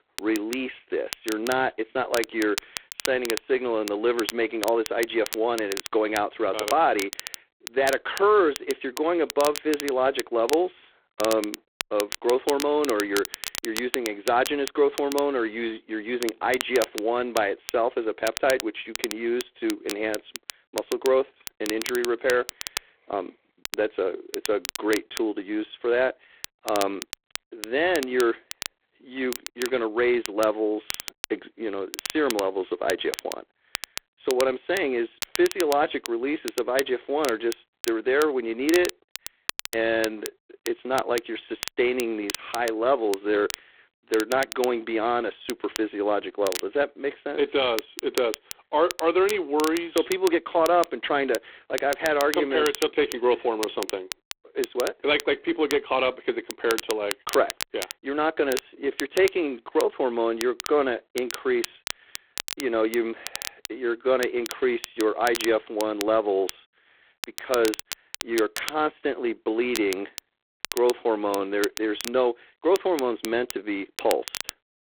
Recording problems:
phone-call audio; poor line; nothing above 3.5 kHz
crackle, like an old record; loud; 10 dB below the speech

